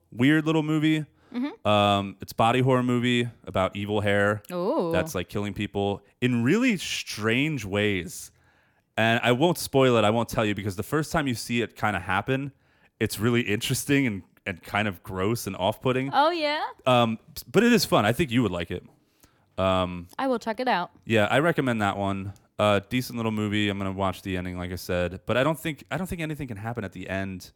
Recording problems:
none

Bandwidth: 18 kHz